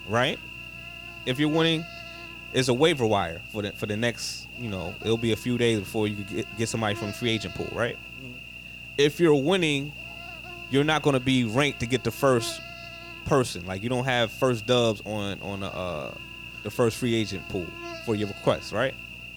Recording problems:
electrical hum; noticeable; throughout; 60 Hz, 10 dB below the speech

